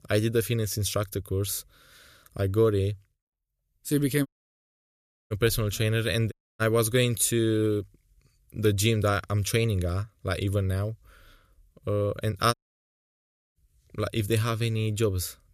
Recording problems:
audio cutting out; at 4.5 s for 1 s, at 6.5 s and at 13 s for 1 s

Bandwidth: 14.5 kHz